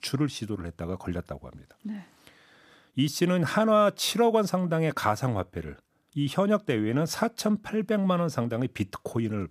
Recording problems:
none

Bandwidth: 14.5 kHz